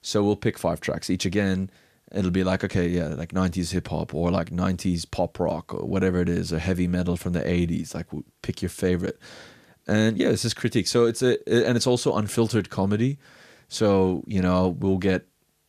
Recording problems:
none

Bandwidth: 14.5 kHz